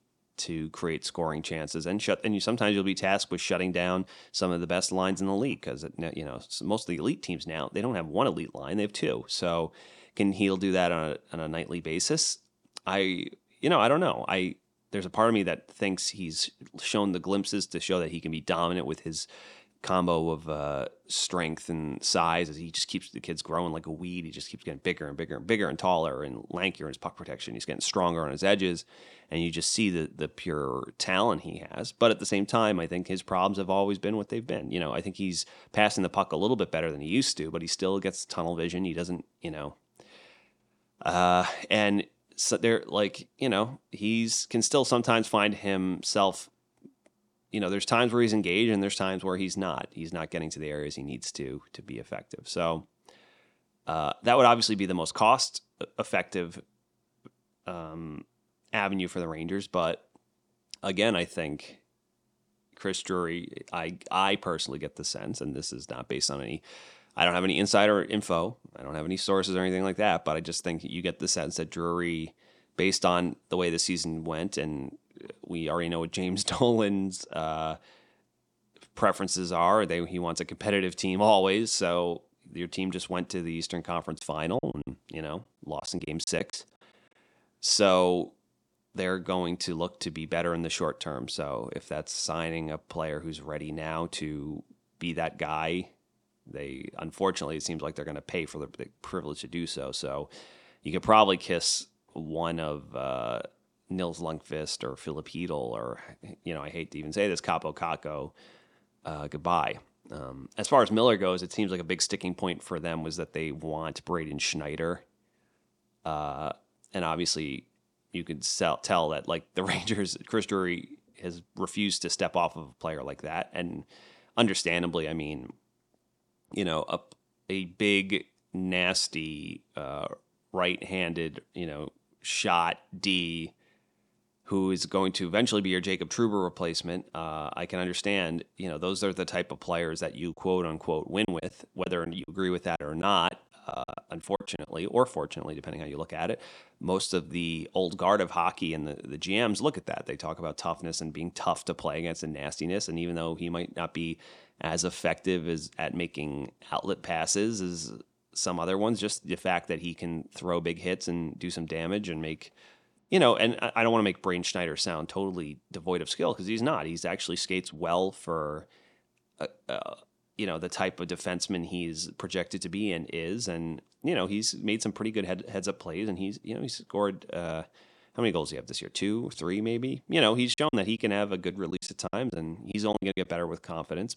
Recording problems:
choppy; very; from 1:24 to 1:27, from 2:21 to 2:25 and from 3:01 to 3:03; 12% of the speech affected

